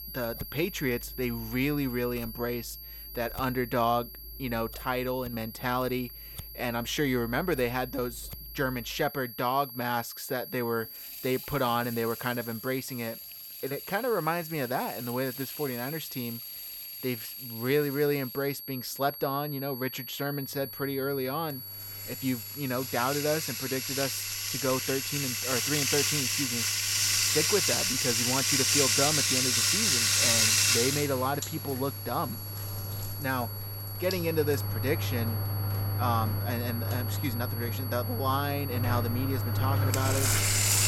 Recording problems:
household noises; very loud; throughout; 4 dB above the speech
high-pitched whine; loud; throughout; 11.5 kHz, 8 dB below the speech

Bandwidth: 18.5 kHz